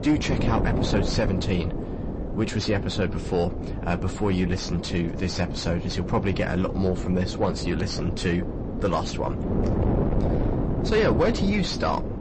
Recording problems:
distortion; slight; 10 dB below the speech
garbled, watery; slightly; nothing above 8 kHz
wind noise on the microphone; heavy; 6 dB below the speech

